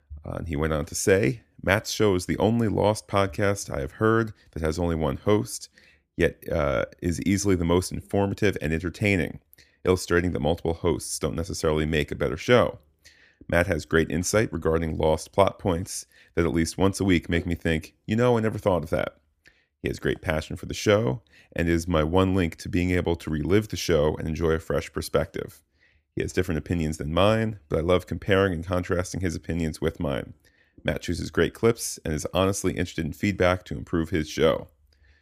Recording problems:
none

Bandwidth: 15 kHz